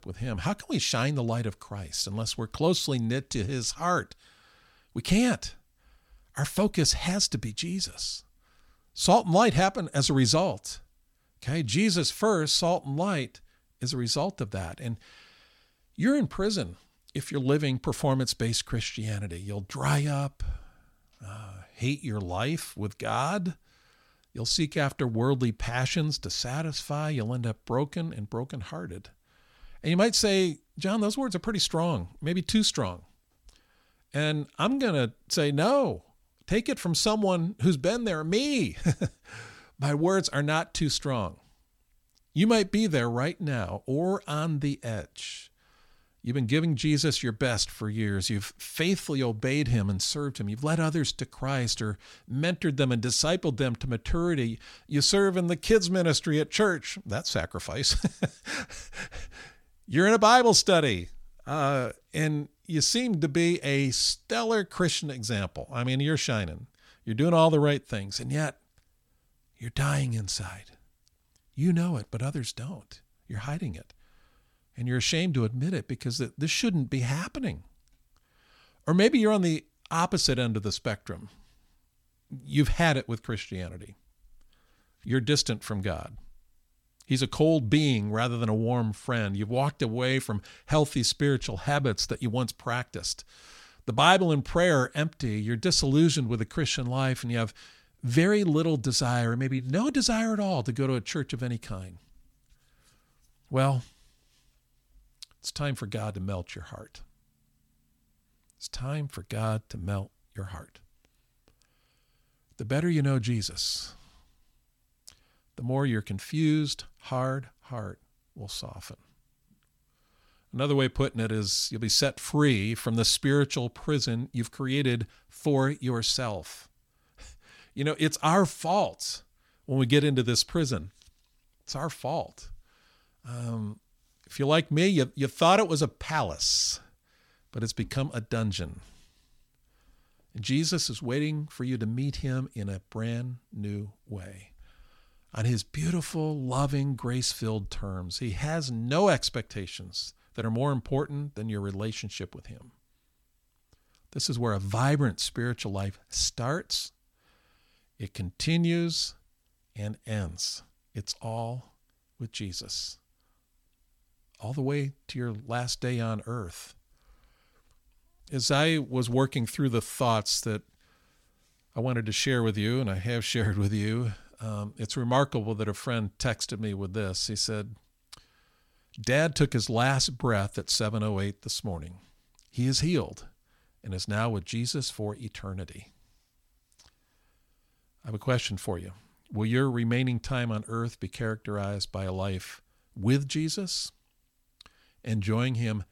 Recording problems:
none

